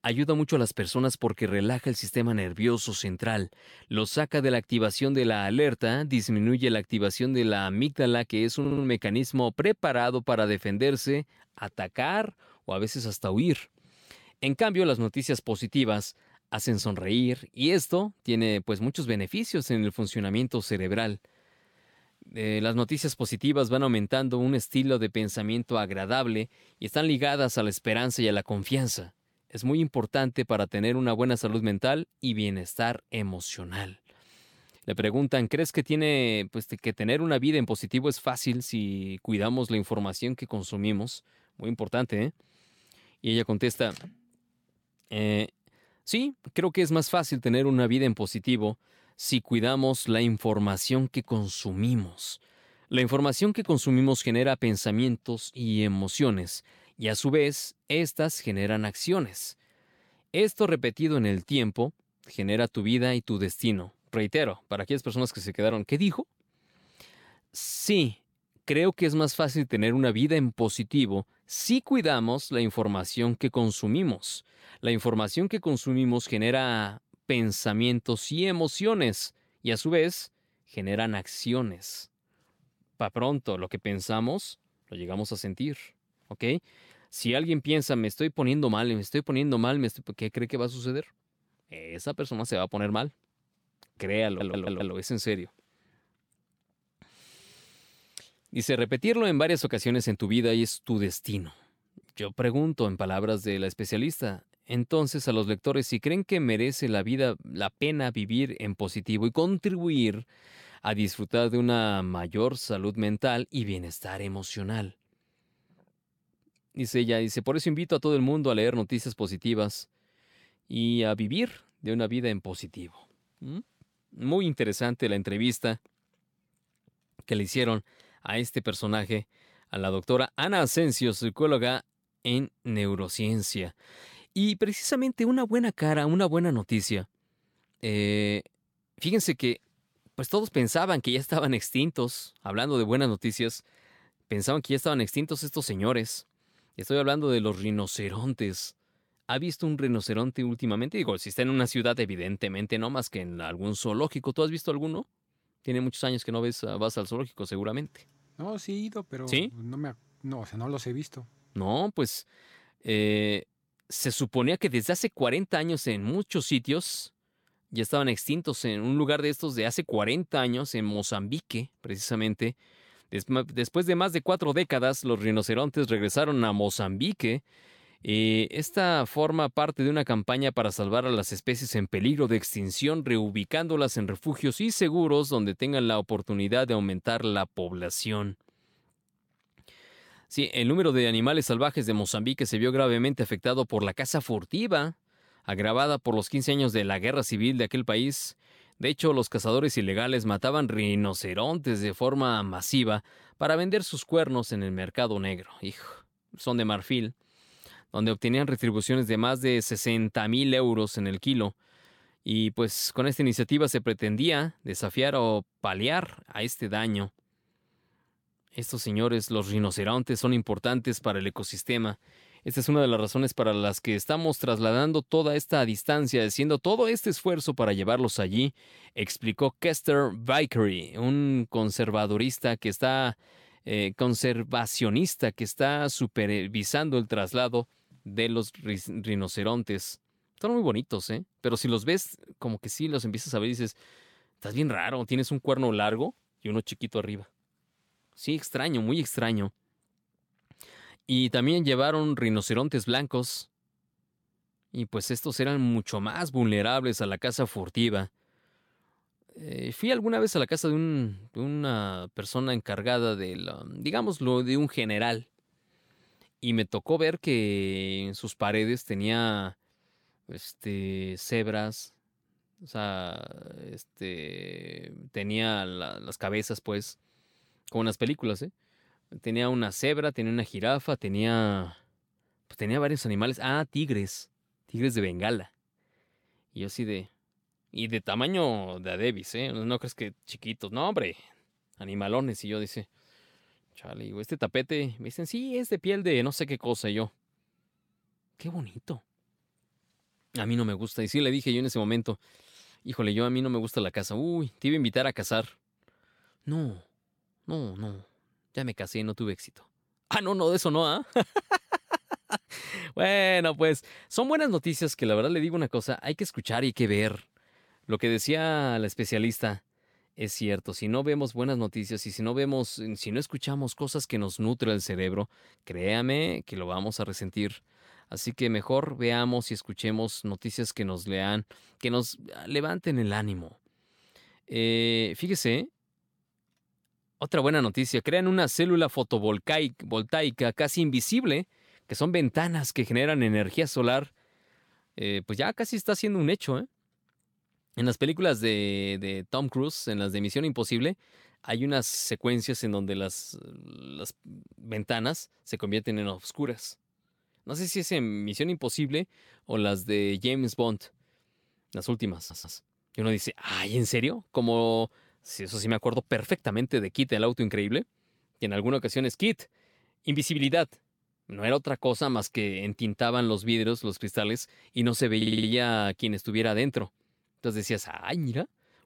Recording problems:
audio stuttering; 4 times, first at 8.5 s

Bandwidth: 17 kHz